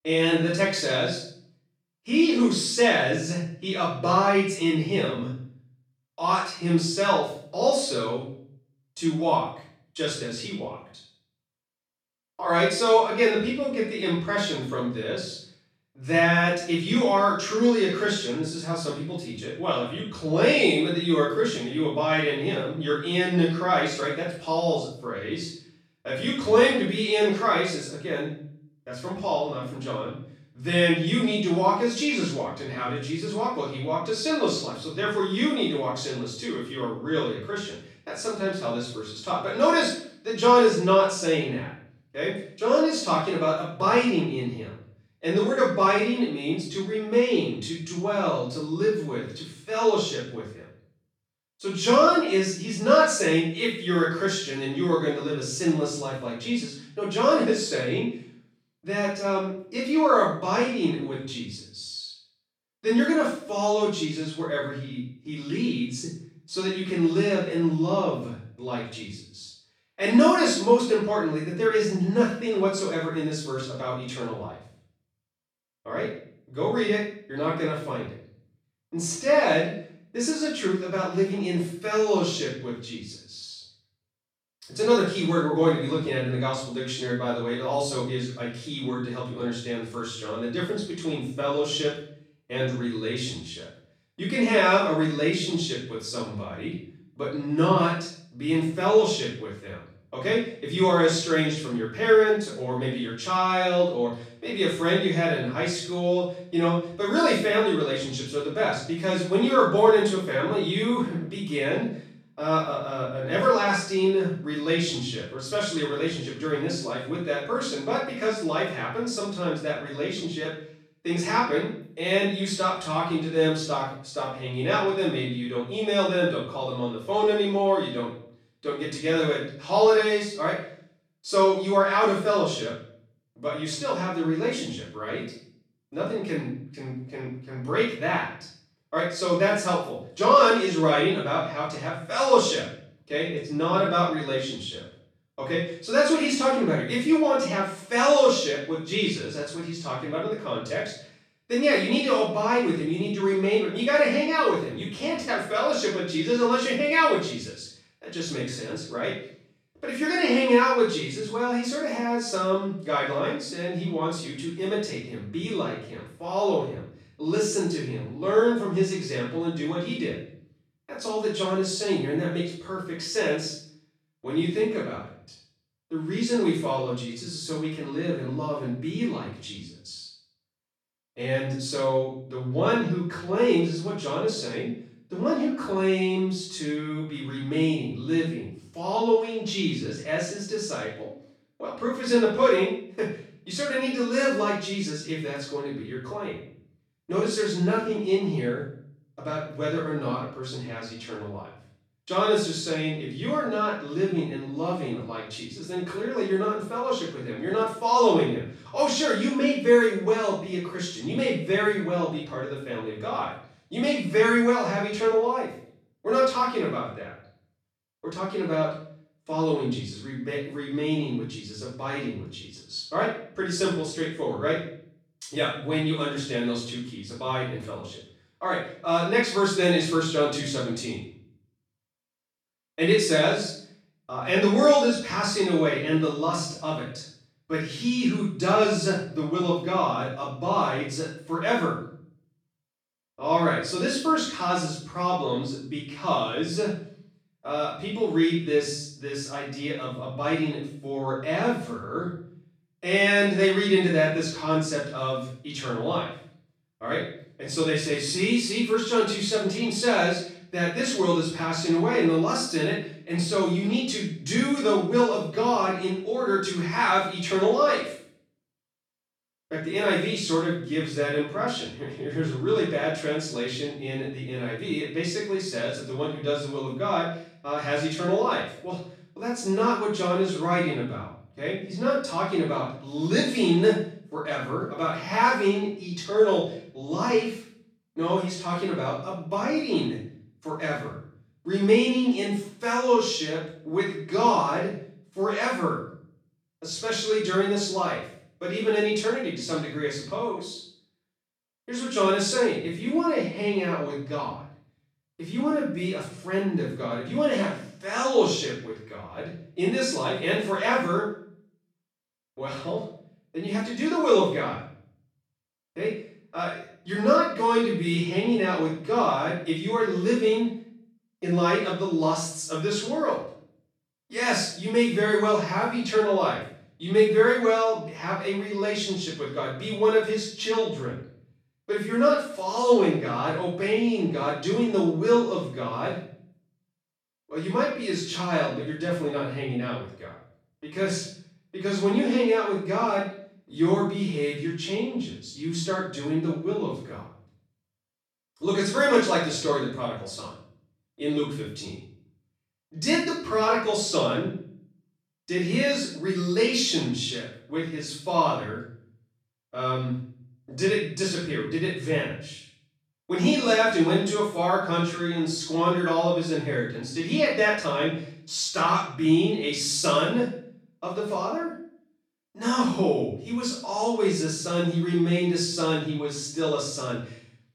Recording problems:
off-mic speech; far
room echo; noticeable; dies away in 0.5 s

